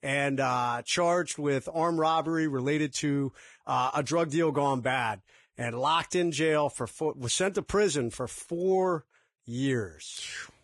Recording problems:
garbled, watery; badly

